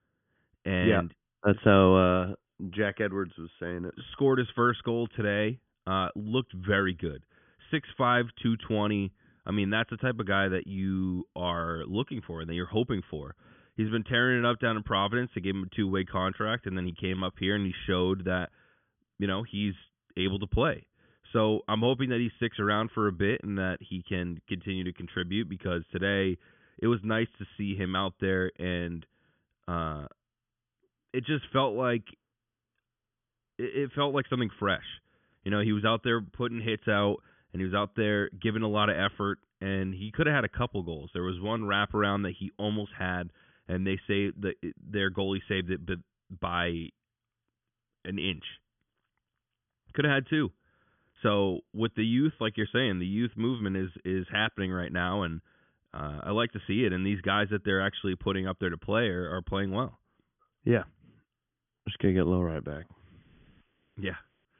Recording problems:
high frequencies cut off; severe; nothing above 3.5 kHz

